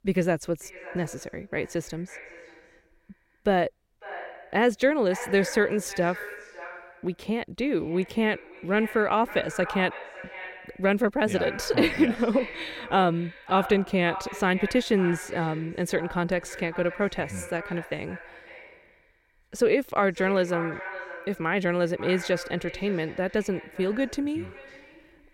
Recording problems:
echo of what is said; noticeable; throughout; 550 ms later, 15 dB below the speech

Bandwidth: 16 kHz